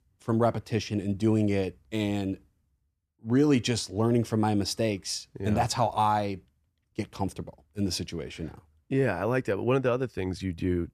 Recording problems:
none

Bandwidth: 14 kHz